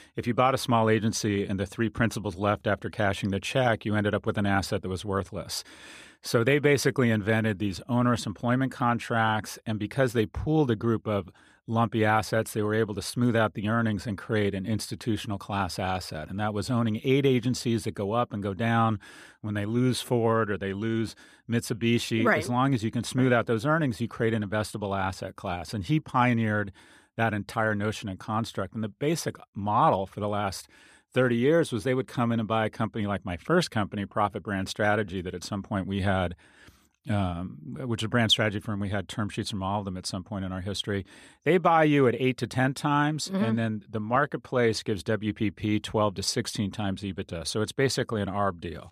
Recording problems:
none

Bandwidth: 14.5 kHz